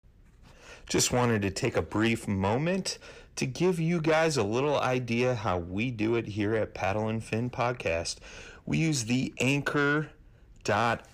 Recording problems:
distortion; slight; 10 dB below the speech

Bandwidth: 15 kHz